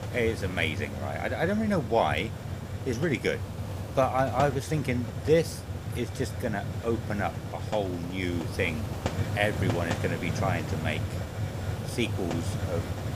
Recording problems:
hiss; loud; throughout; 4 dB below the speech

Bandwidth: 15 kHz